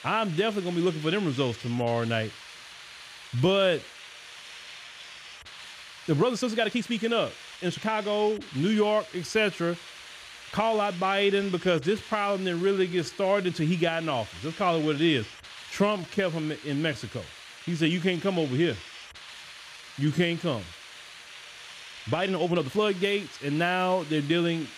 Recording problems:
hiss; noticeable; throughout; 15 dB below the speech
uneven, jittery; strongly; from 1.5 to 23 s

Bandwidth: 14.5 kHz